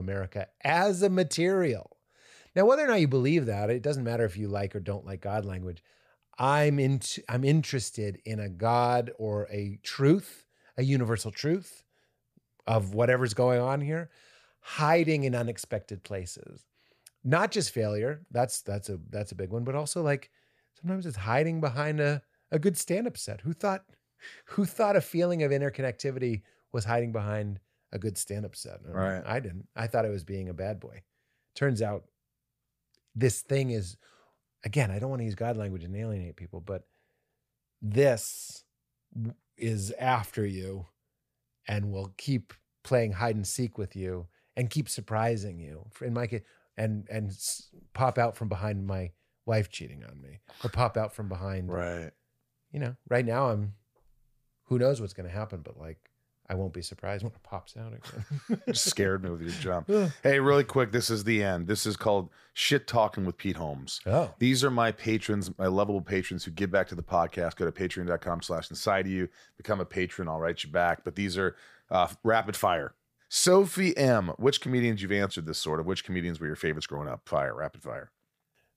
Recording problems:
abrupt cut into speech; at the start

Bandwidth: 15 kHz